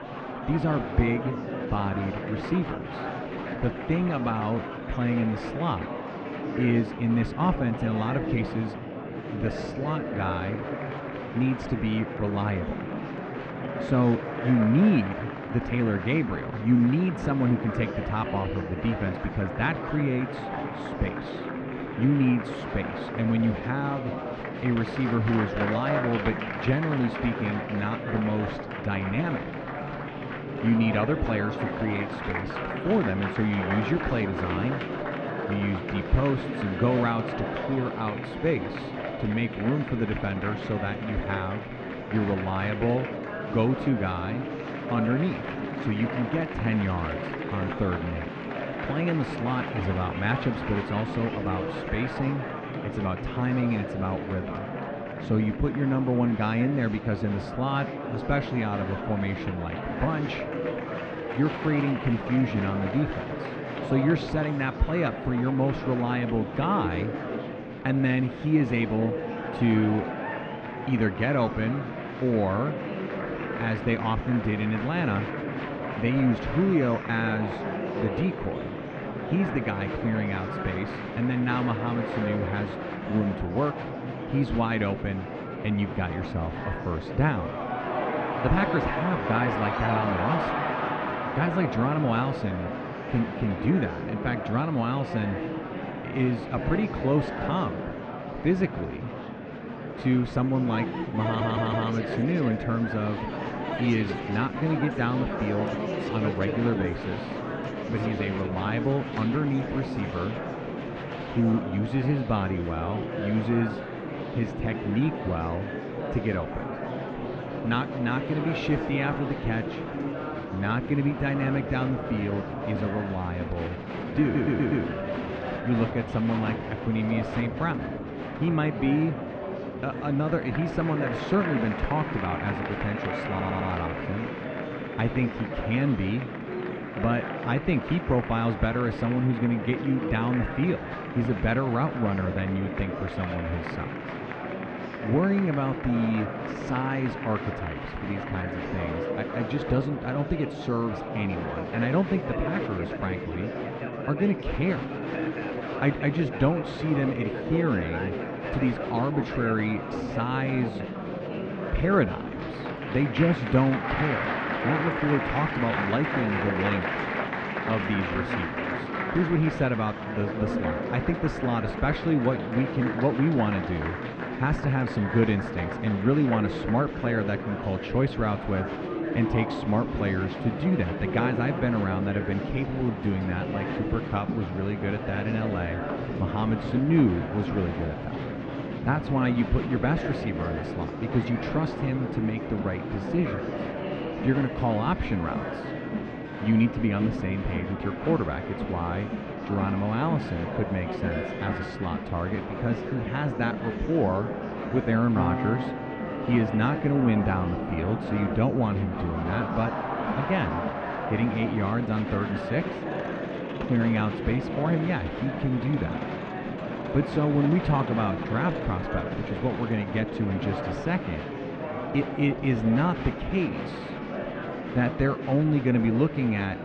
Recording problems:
muffled; very; fading above 2.5 kHz
murmuring crowd; loud; throughout; 5 dB below the speech
background music; noticeable; throughout; 15 dB below the speech
audio stuttering; at 1:41, at 2:04 and at 2:13

